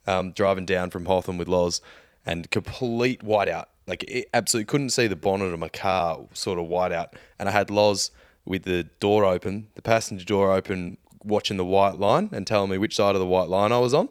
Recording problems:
uneven, jittery; strongly; from 2 to 13 s

